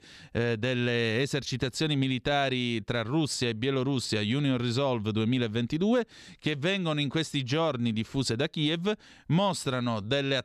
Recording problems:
none

